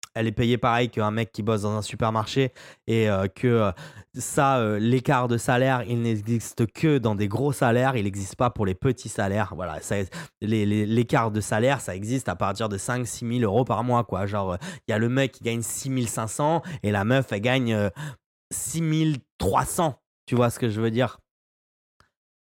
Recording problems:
none

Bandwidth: 16 kHz